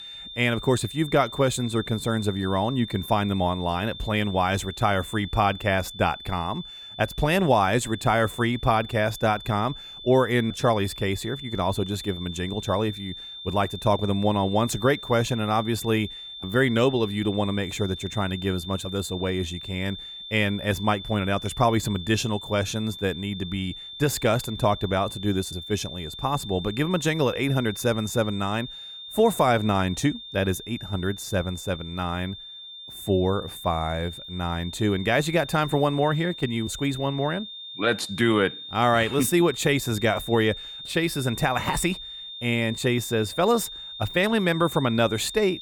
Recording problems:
high-pitched whine; noticeable; throughout; 3.5 kHz, 10 dB below the speech

